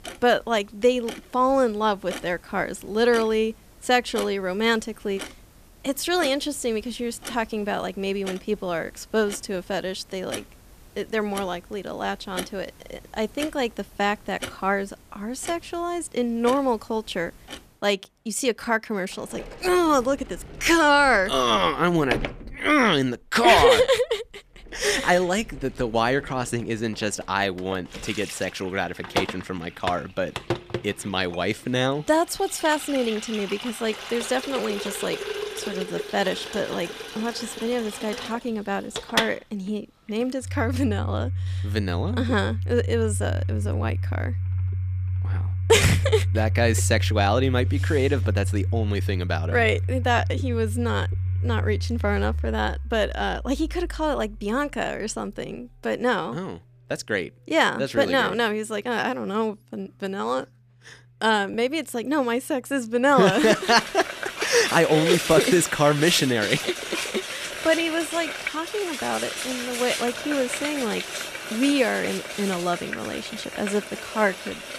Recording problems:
household noises; loud; throughout; 6 dB below the speech

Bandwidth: 14.5 kHz